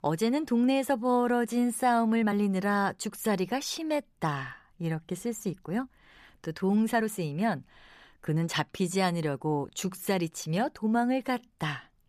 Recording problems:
uneven, jittery; strongly; from 1 to 11 s

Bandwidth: 14.5 kHz